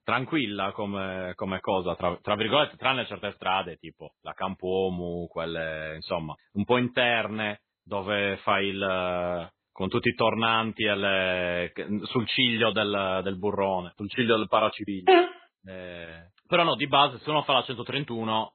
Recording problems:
garbled, watery; badly; nothing above 3.5 kHz

